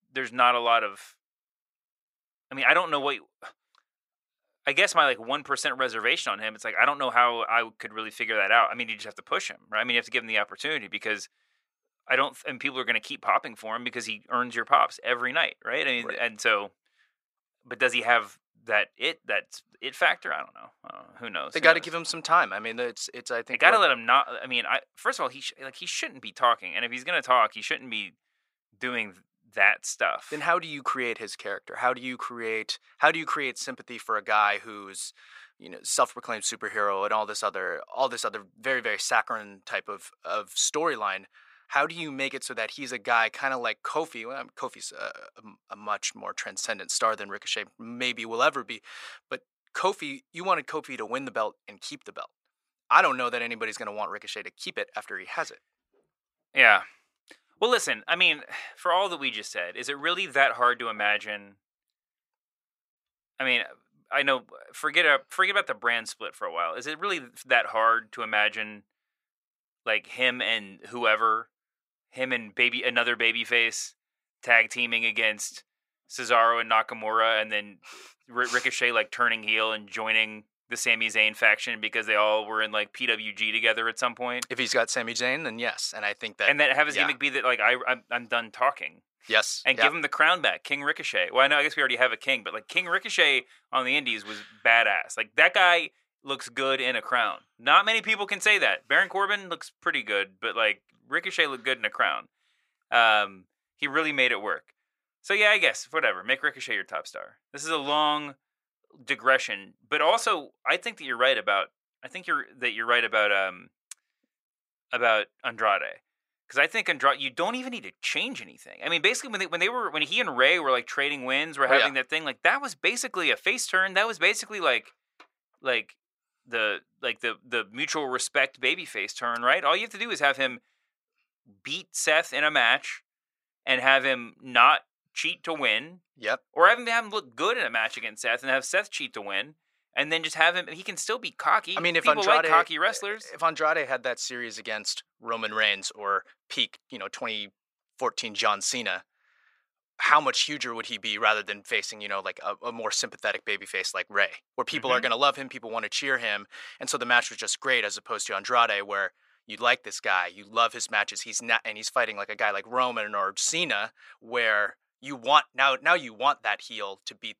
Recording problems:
thin; very; fading below 600 Hz

